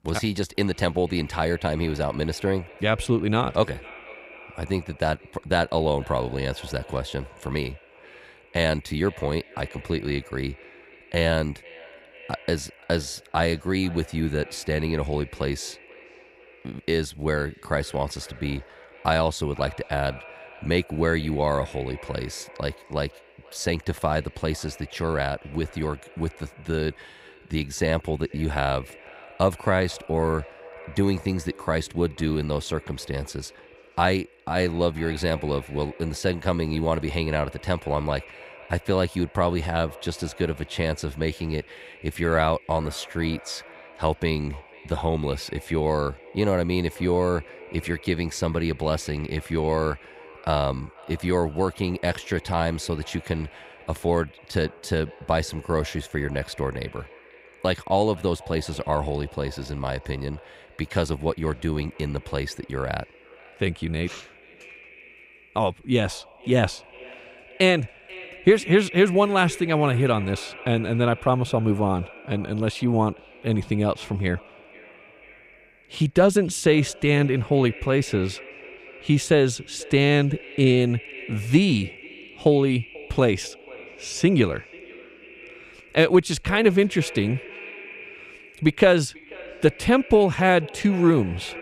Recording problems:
echo of what is said; faint; throughout; 490 ms later, 20 dB below the speech

